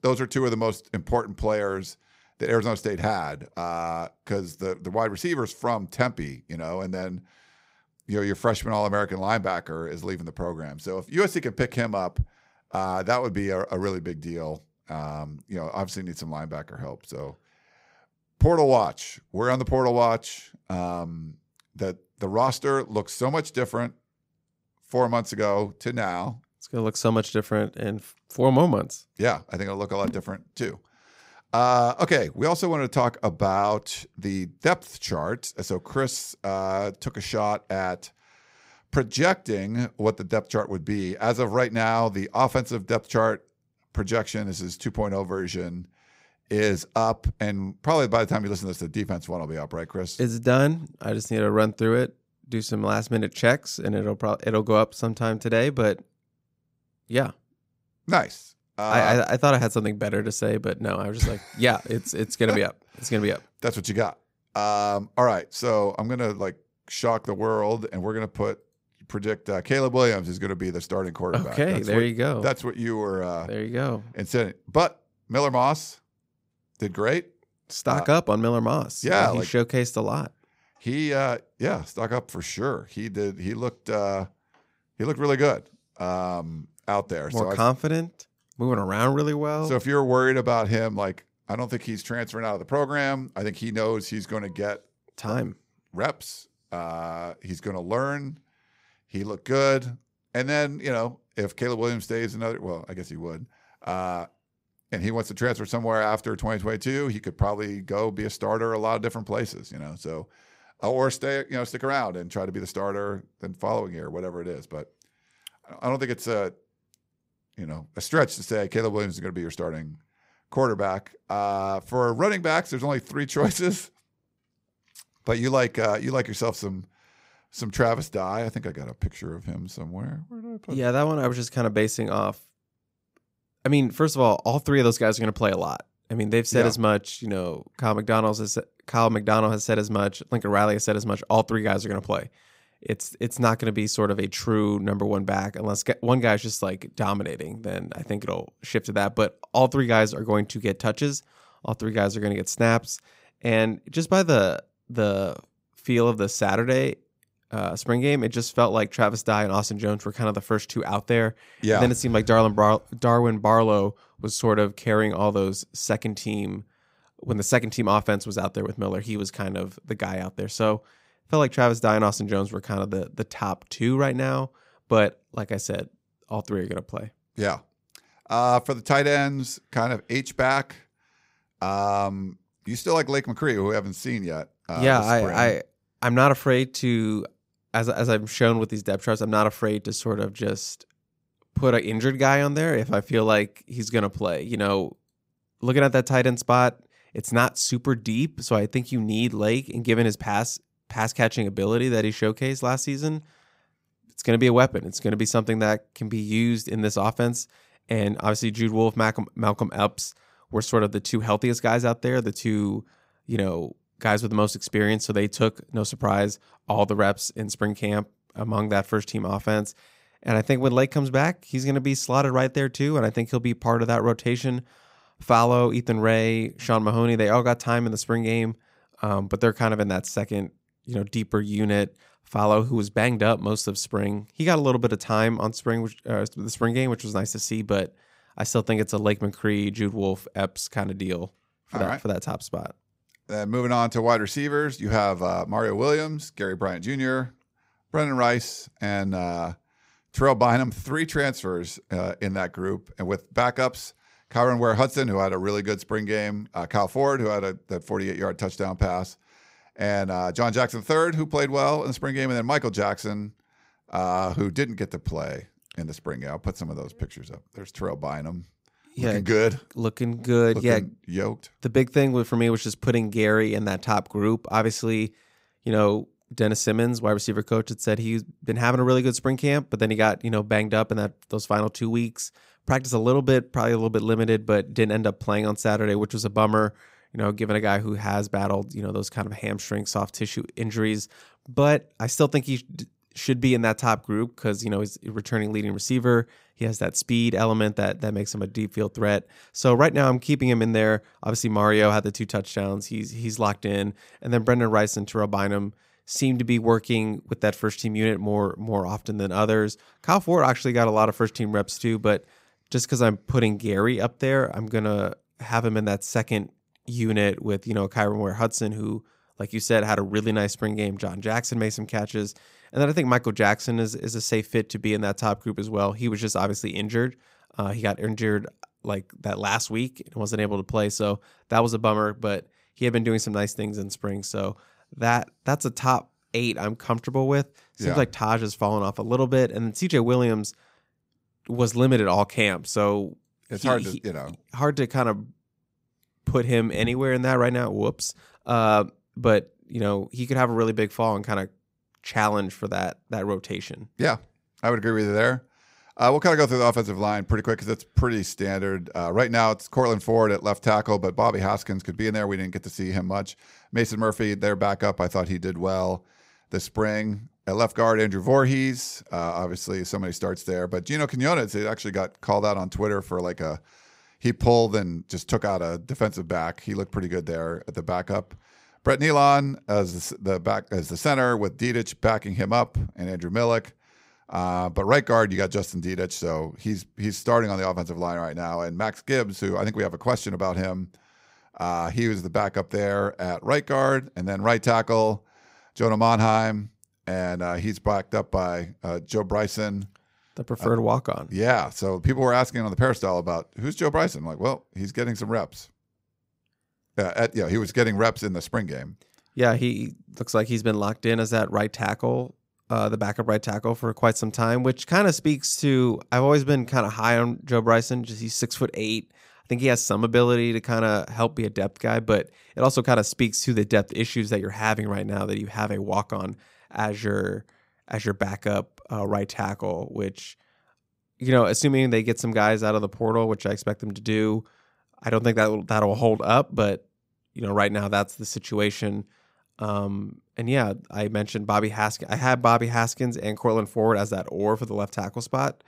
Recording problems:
none

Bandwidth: 15.5 kHz